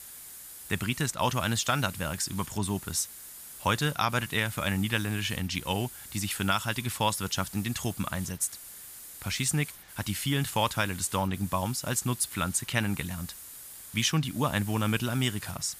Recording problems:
hiss; noticeable; throughout; 15 dB below the speech

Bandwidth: 15 kHz